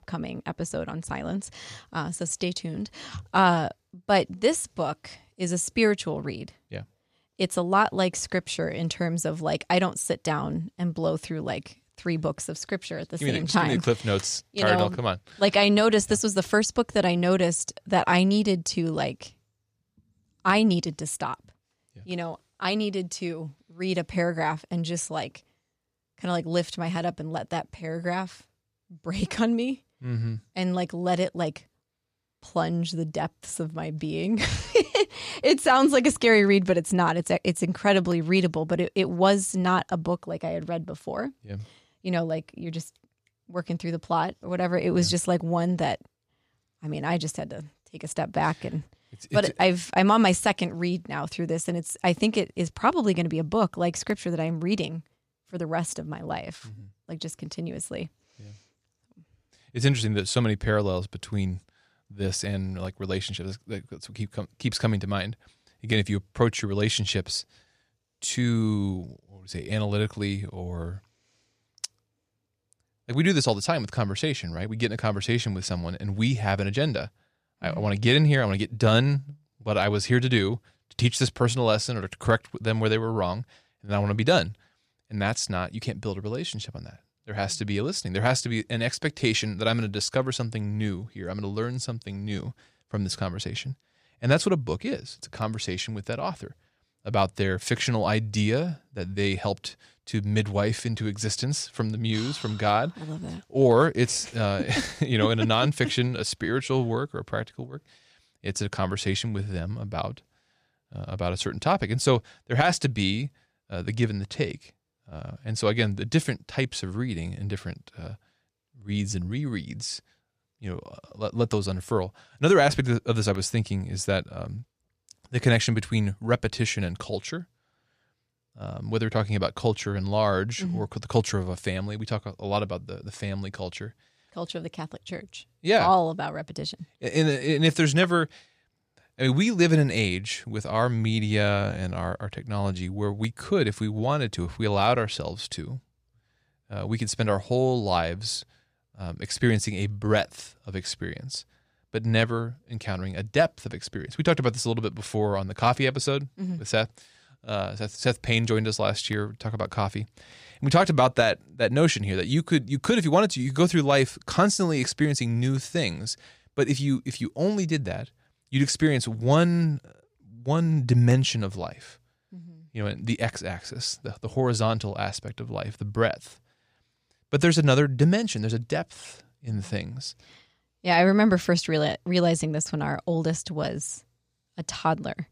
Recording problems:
none

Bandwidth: 14.5 kHz